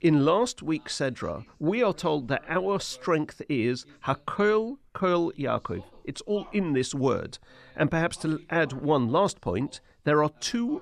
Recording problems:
voice in the background; faint; throughout; 30 dB below the speech

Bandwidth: 13.5 kHz